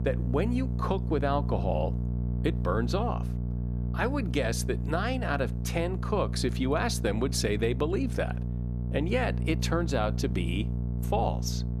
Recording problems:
electrical hum; noticeable; throughout; 60 Hz, 10 dB below the speech

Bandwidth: 14 kHz